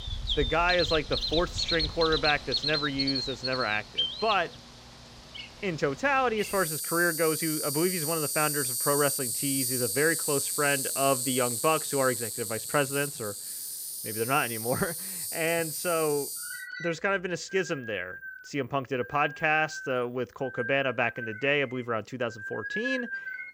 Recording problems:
animal sounds; loud; throughout; 2 dB below the speech

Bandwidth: 16 kHz